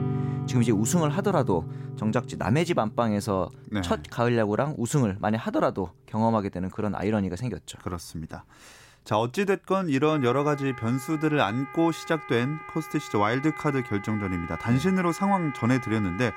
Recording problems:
background music; noticeable; throughout; 10 dB below the speech

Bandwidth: 16 kHz